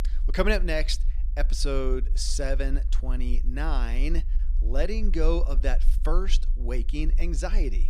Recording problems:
low rumble; faint; throughout; 20 dB below the speech

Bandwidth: 14.5 kHz